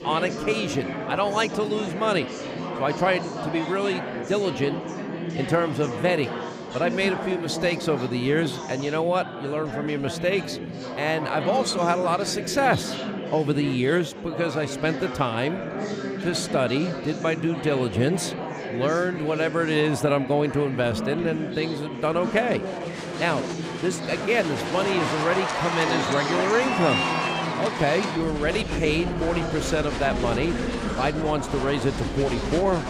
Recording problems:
murmuring crowd; loud; throughout; 4 dB below the speech

